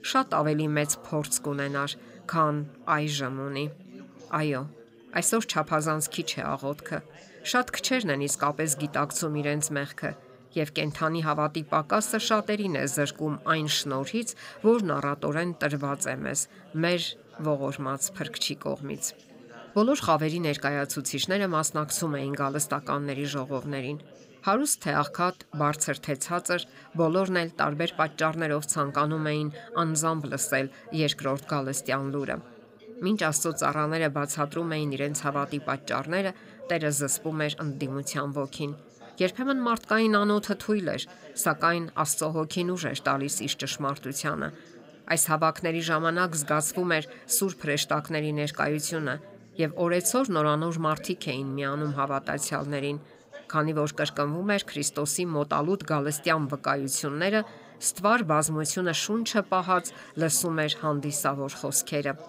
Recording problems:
background chatter; faint; throughout; 4 voices, 20 dB below the speech

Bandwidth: 15.5 kHz